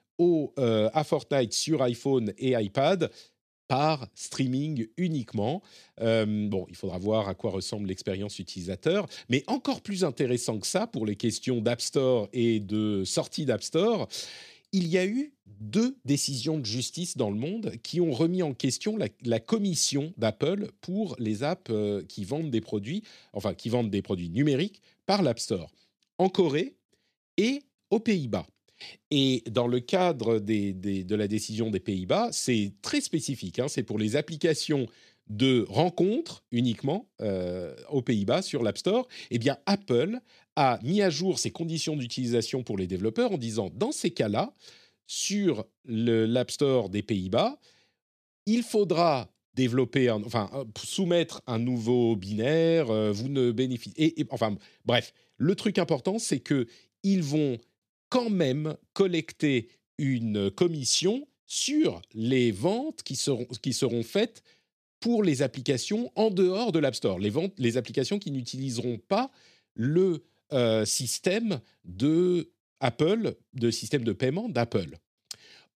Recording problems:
none

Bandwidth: 14 kHz